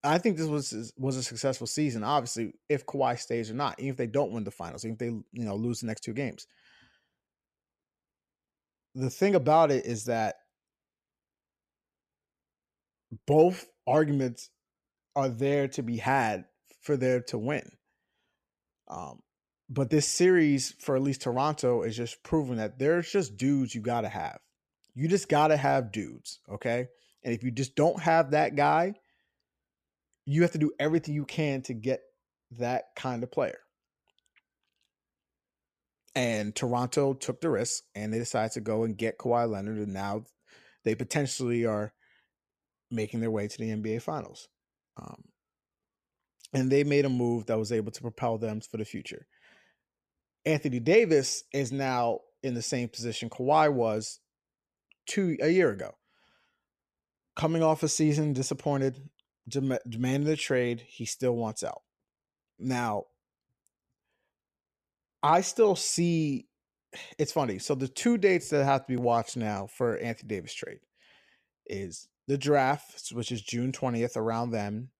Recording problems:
none

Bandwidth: 14.5 kHz